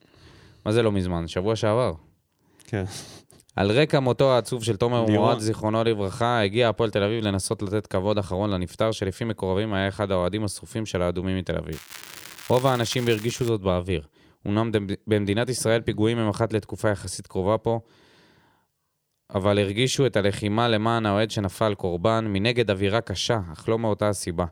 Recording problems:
crackling; noticeable; from 12 to 13 s; 15 dB below the speech

